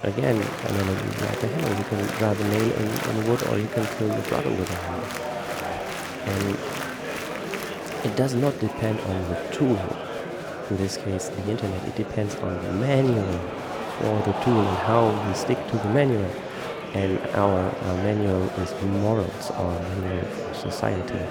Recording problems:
murmuring crowd; loud; throughout; 5 dB below the speech

